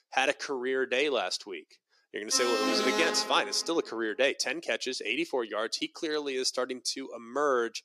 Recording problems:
thin; somewhat; fading below 300 Hz
alarm; loud; from 2.5 to 3.5 s; peak 1 dB above the speech

